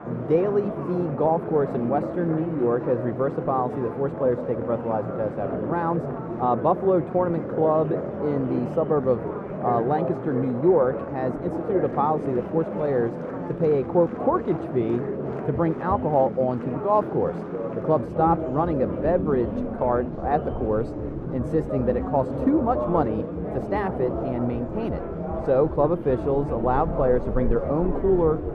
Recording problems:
muffled; very; fading above 1.5 kHz
murmuring crowd; loud; throughout; 5 dB below the speech

